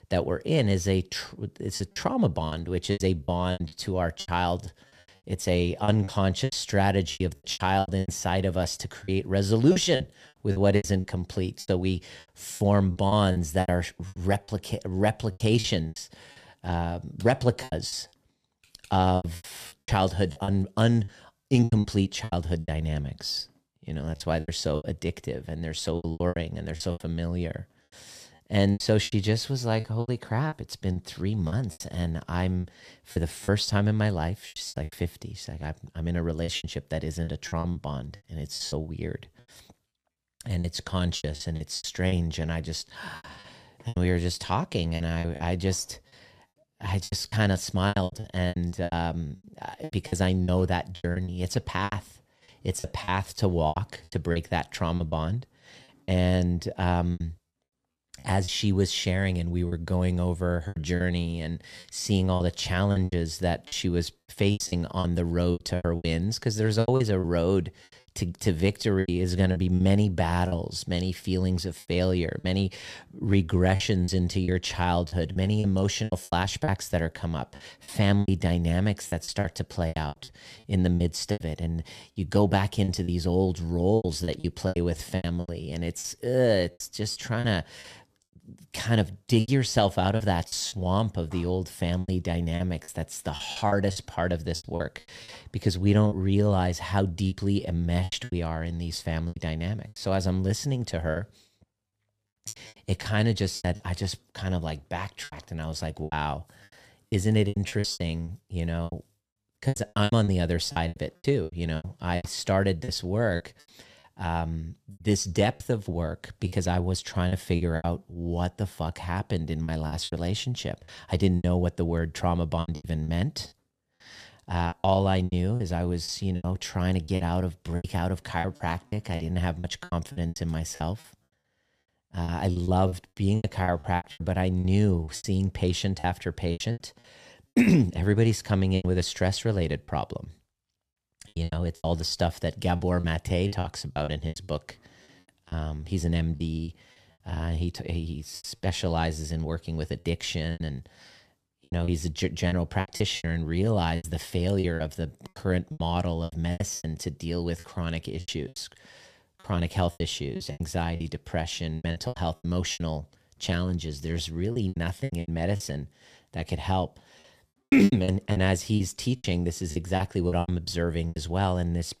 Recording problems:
choppy; very; 13% of the speech affected

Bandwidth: 14.5 kHz